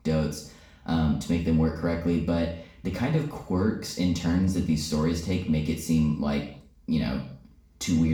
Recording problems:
off-mic speech; far
room echo; noticeable; dies away in 0.5 s
abrupt cut into speech; at the end

